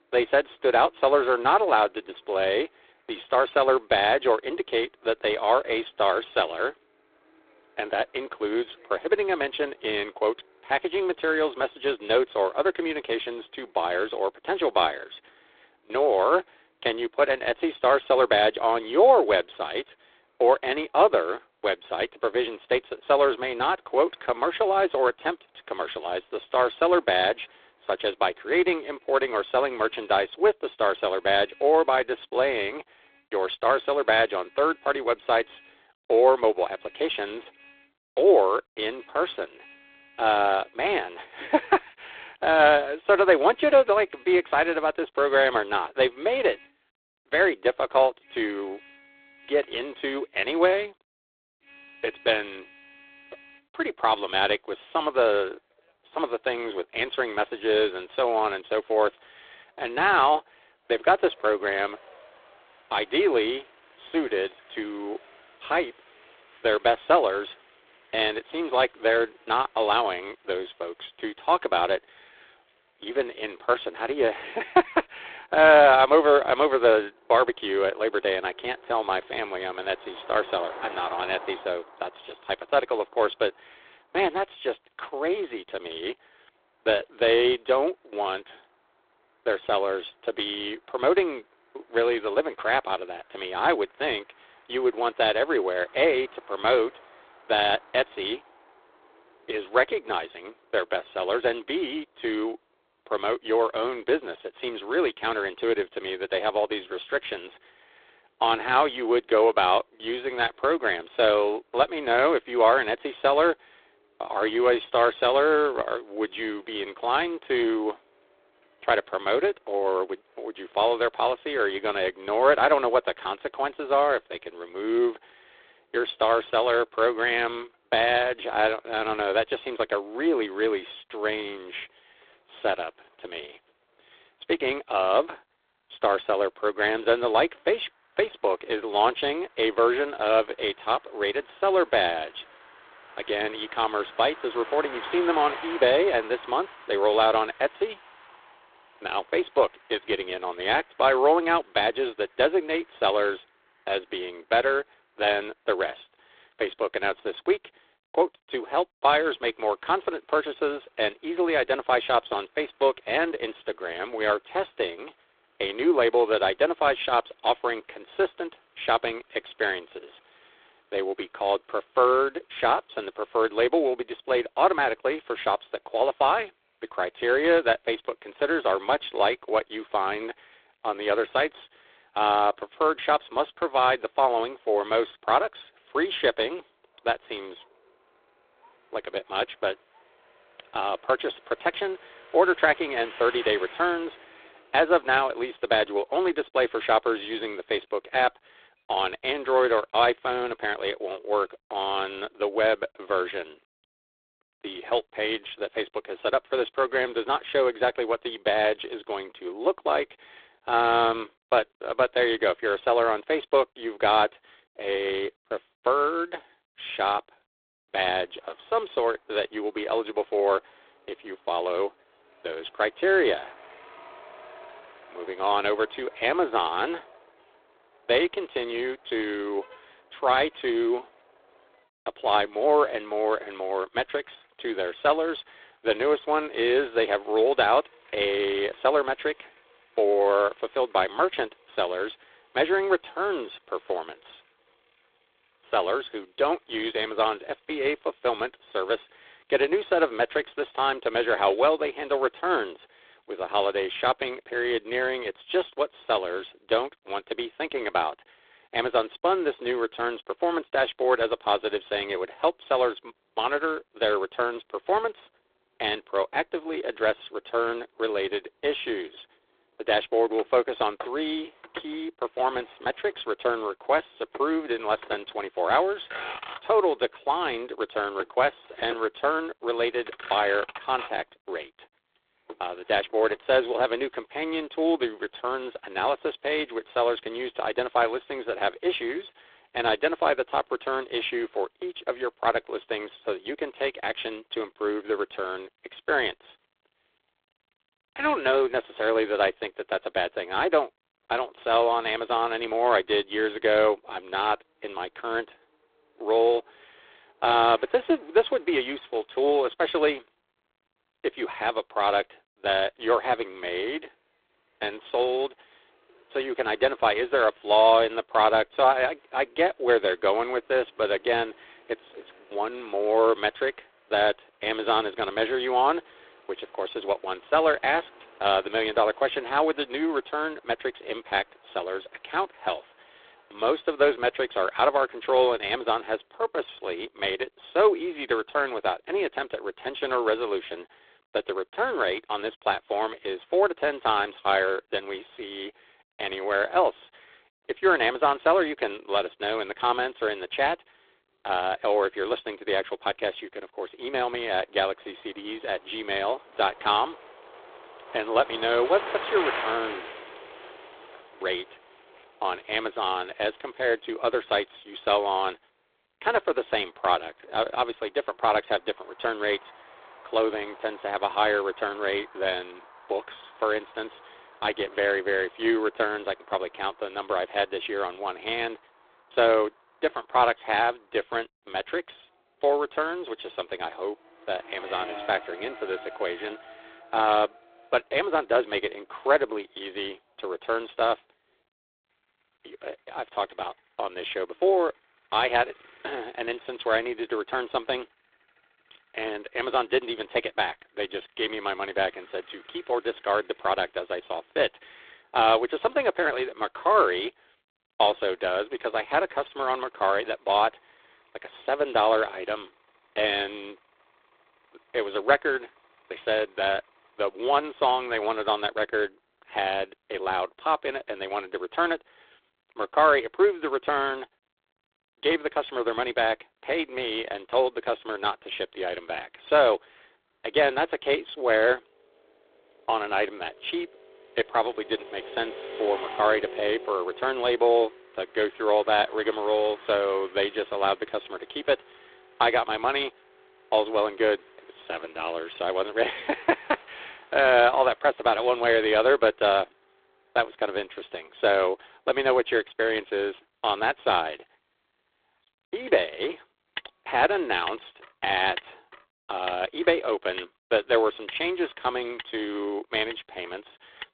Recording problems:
phone-call audio; poor line; nothing above 3.5 kHz
traffic noise; faint; throughout; 20 dB below the speech

